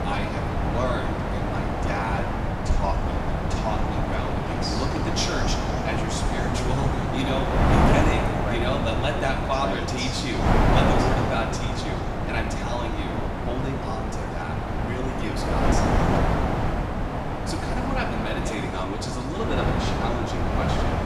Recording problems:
room echo; noticeable; dies away in 1.9 s
off-mic speech; somewhat distant
wind noise on the microphone; heavy; 2 dB above the speech

